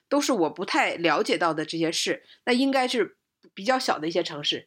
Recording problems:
none

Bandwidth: 16 kHz